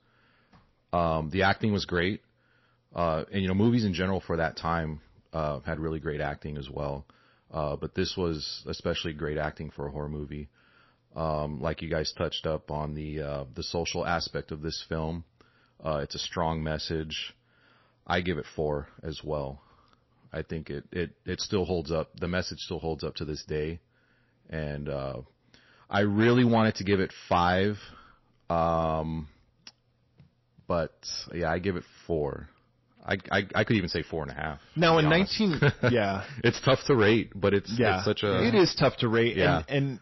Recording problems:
distortion; slight; 1.7% of the sound clipped
garbled, watery; slightly; nothing above 5.5 kHz

